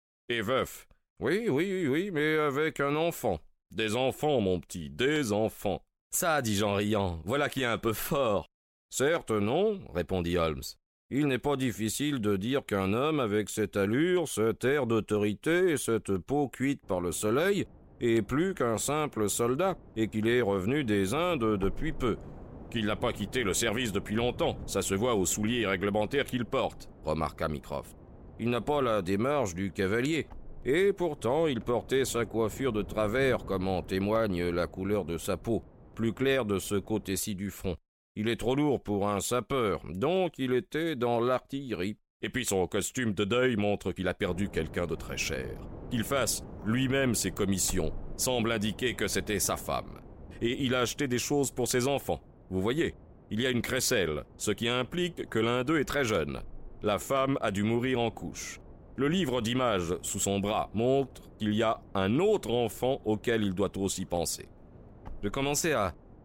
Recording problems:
wind noise on the microphone; occasional gusts; from 17 to 37 s and from 44 s on; 25 dB below the speech

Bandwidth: 16 kHz